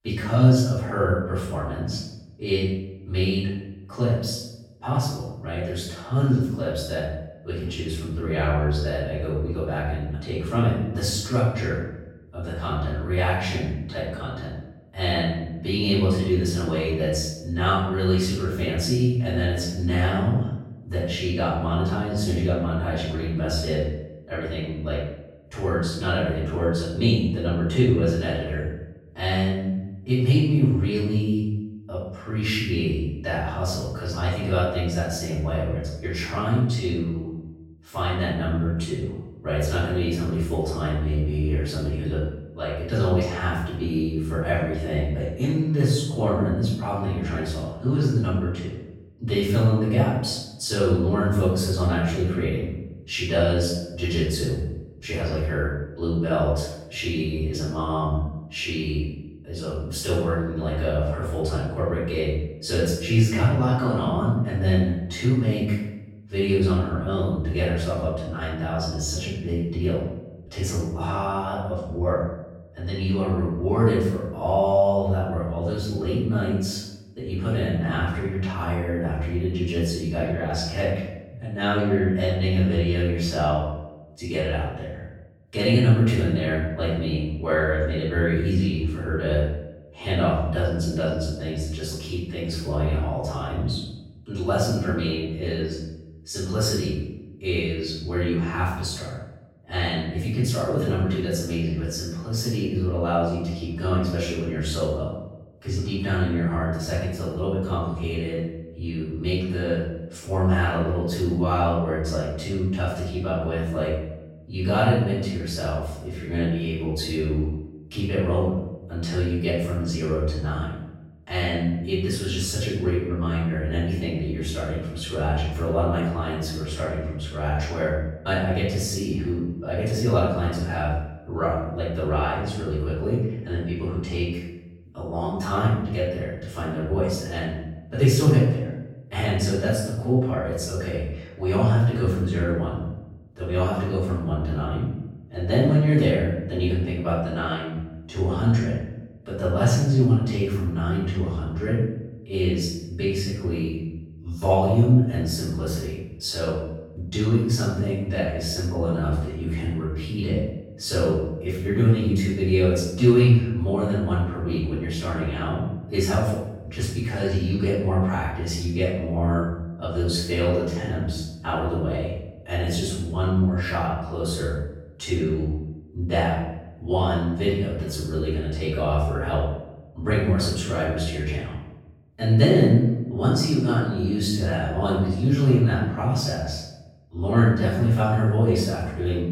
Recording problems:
off-mic speech; far
room echo; noticeable; dies away in 0.7 s

